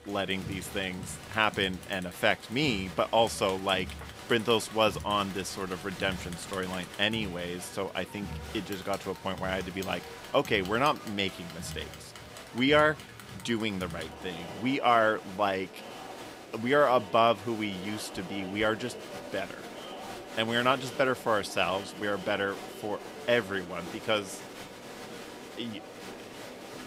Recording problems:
crowd noise; noticeable; throughout; 15 dB below the speech

